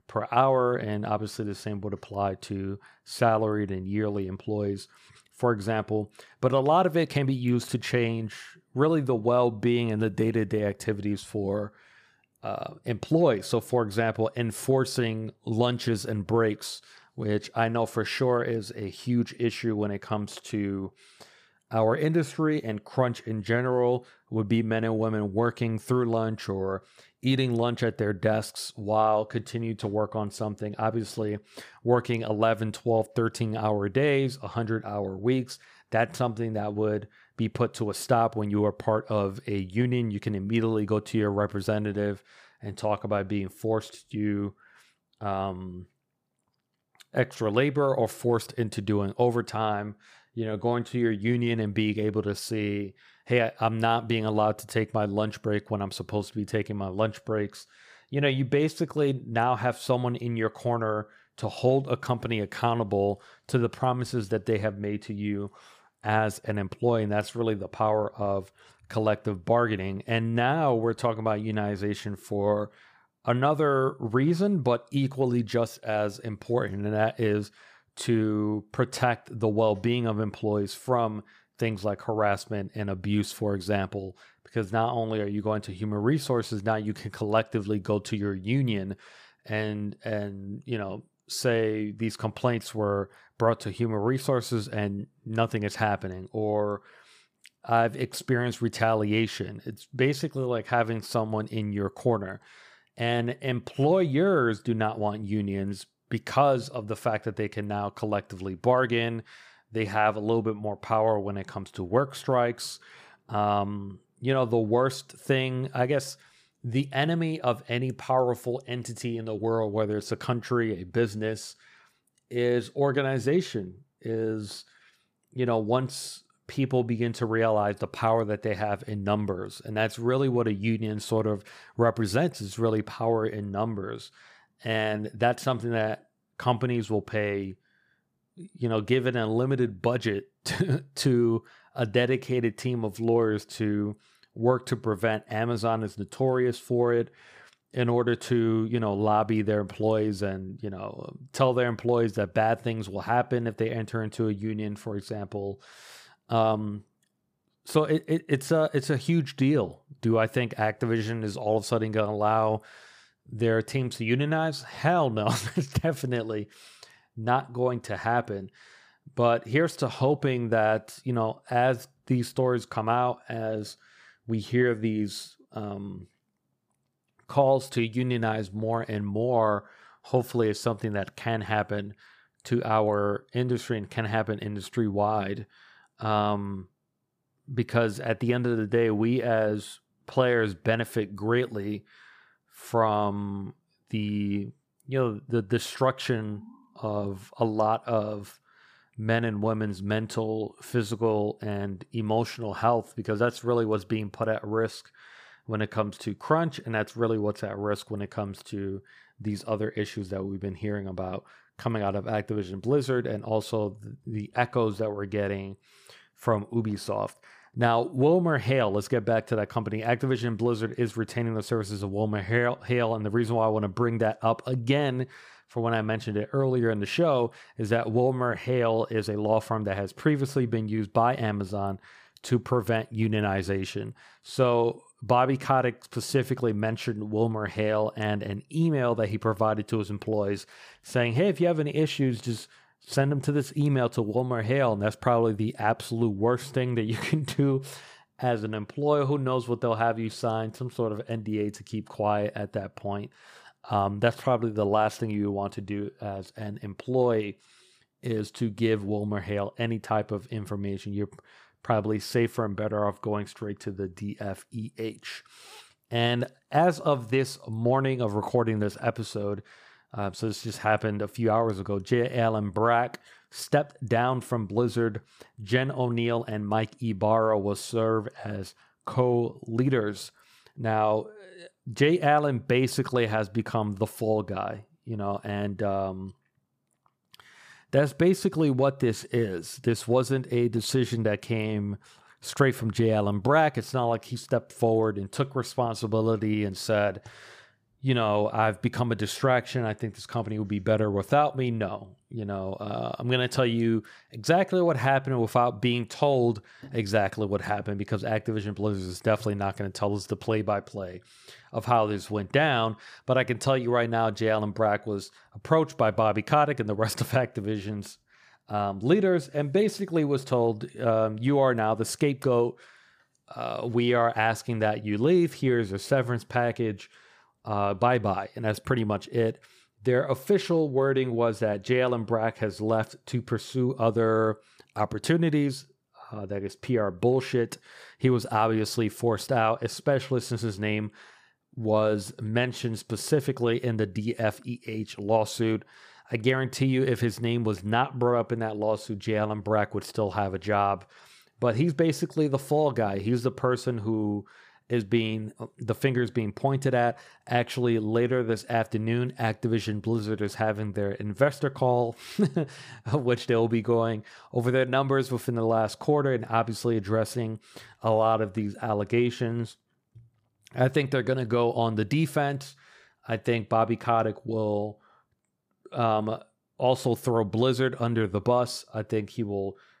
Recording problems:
none

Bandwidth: 15 kHz